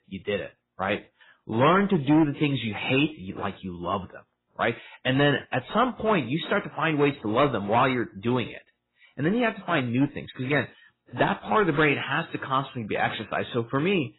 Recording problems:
garbled, watery; badly; nothing above 4 kHz
distortion; slight; 4% of the sound clipped

